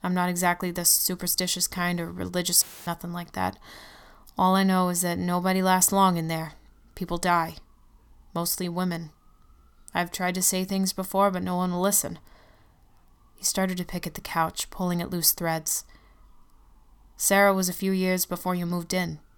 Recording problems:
audio cutting out; filled with static; at 2.5 s

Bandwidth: 18.5 kHz